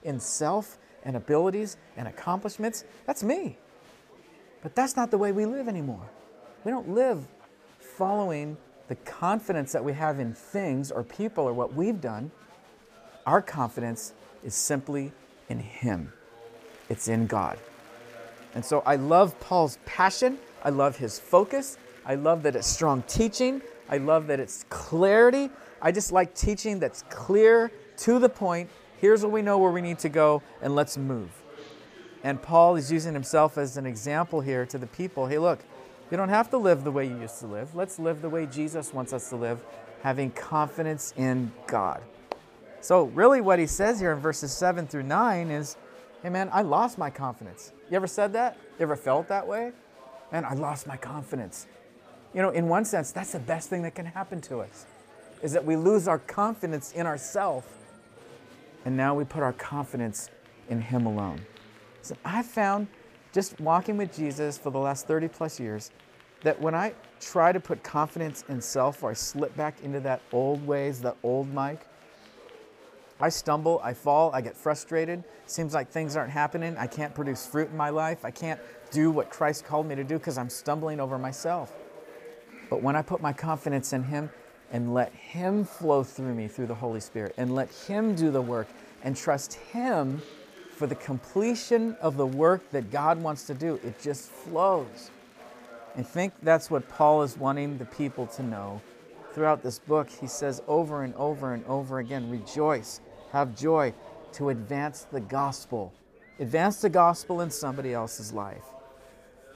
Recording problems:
murmuring crowd; faint; throughout; 25 dB below the speech

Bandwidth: 15 kHz